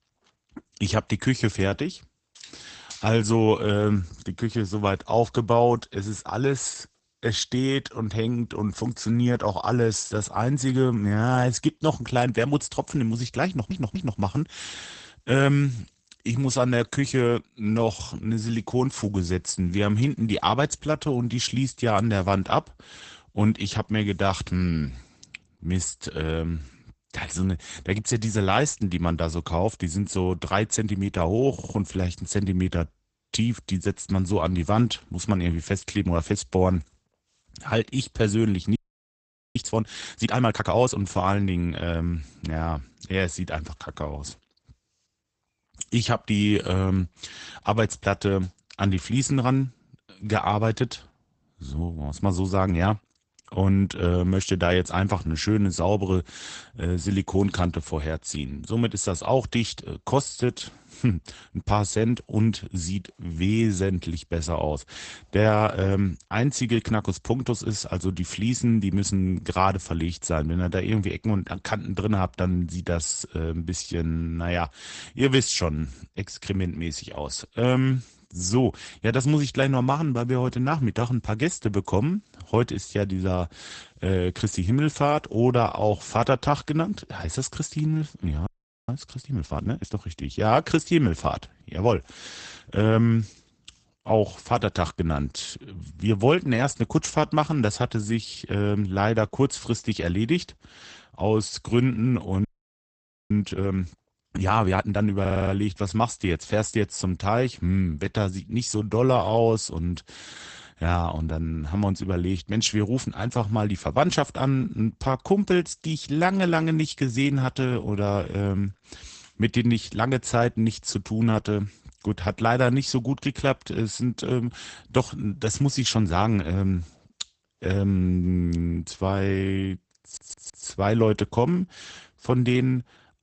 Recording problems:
garbled, watery; badly; nothing above 8 kHz
audio stuttering; 4 times, first at 13 s
audio freezing; at 39 s for 1 s, at 1:28 and at 1:42 for 1 s

